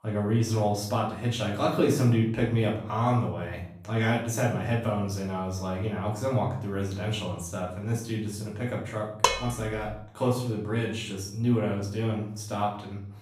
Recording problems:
off-mic speech; far
room echo; noticeable; dies away in 0.6 s
clattering dishes; loud; at 9 s; peak 3 dB above the speech

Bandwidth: 15.5 kHz